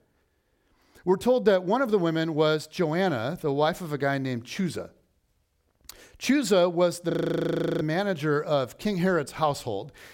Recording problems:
audio freezing; at 7 s for 0.5 s

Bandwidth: 16.5 kHz